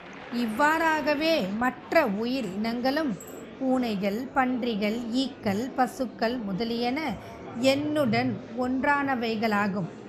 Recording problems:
murmuring crowd; noticeable; throughout; 15 dB below the speech

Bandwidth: 14.5 kHz